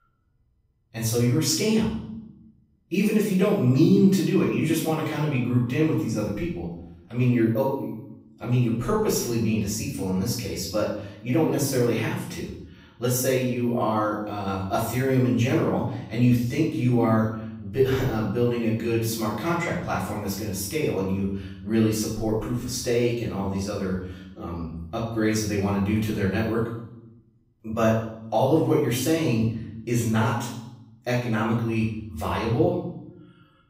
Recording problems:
off-mic speech; far
room echo; noticeable; dies away in 0.7 s

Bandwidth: 15.5 kHz